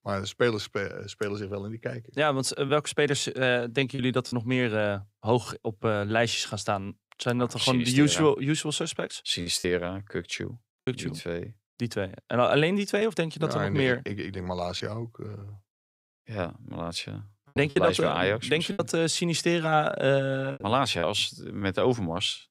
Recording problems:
choppy; occasionally; 3% of the speech affected

